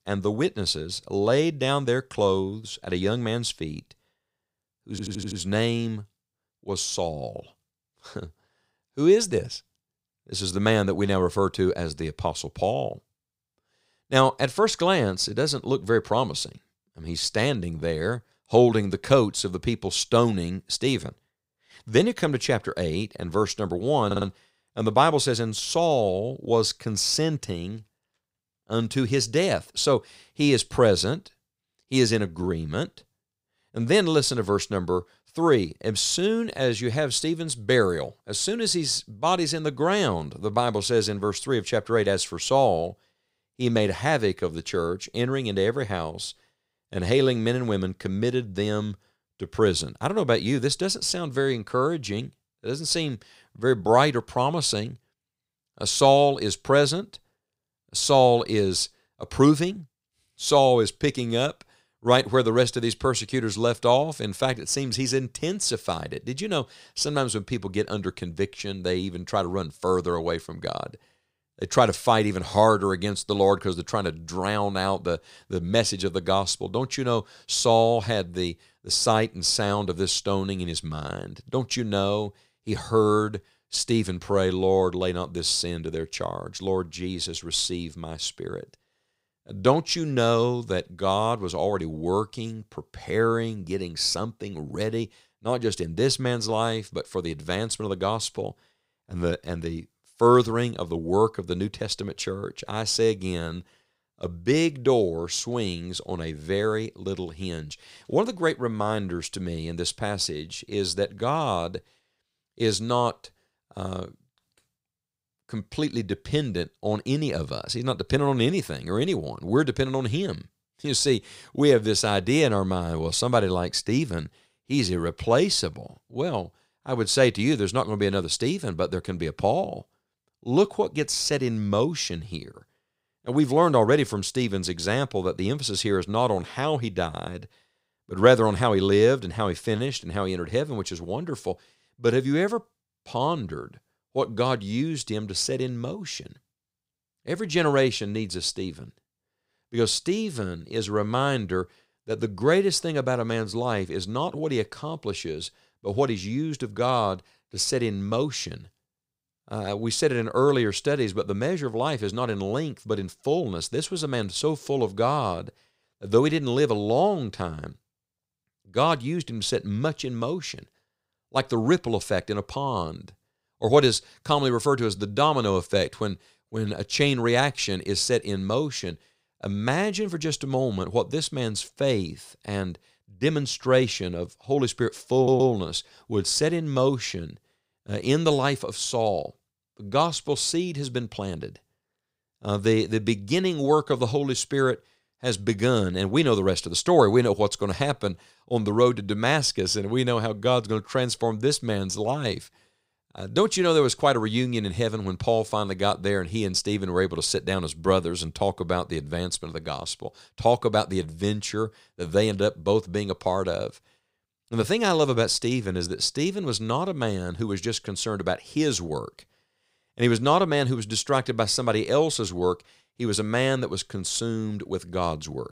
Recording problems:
audio stuttering; at 5 s, at 24 s and at 3:05

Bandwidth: 15.5 kHz